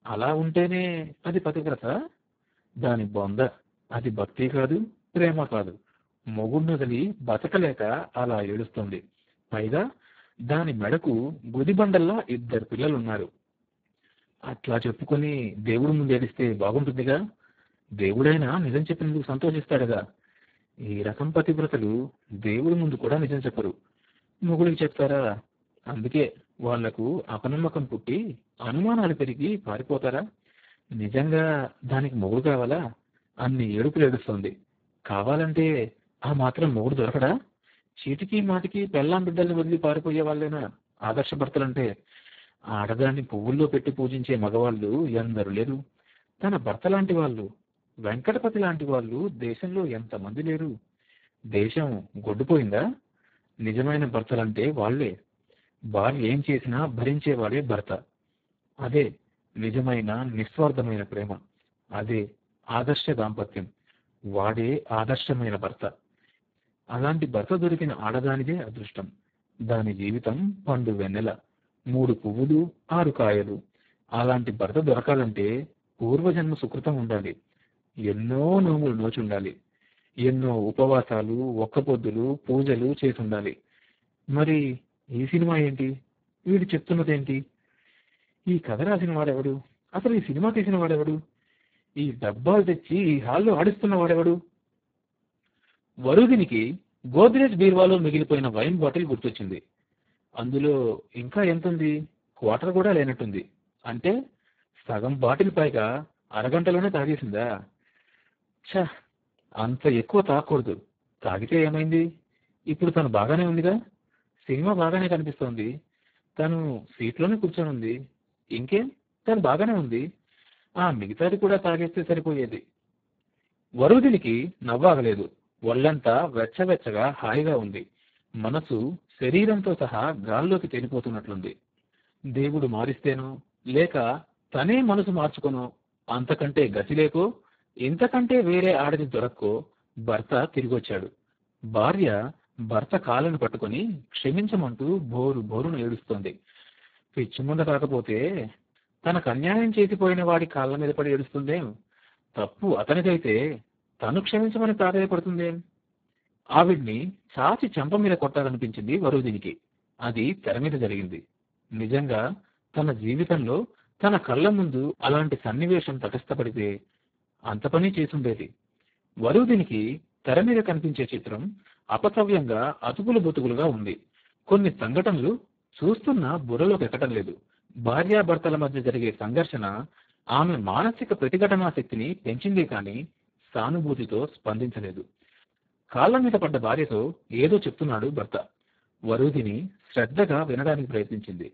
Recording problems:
garbled, watery; badly; nothing above 4 kHz

